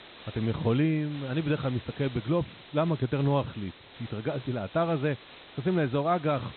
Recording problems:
high frequencies cut off; severe; nothing above 4 kHz
hiss; noticeable; throughout; 20 dB below the speech

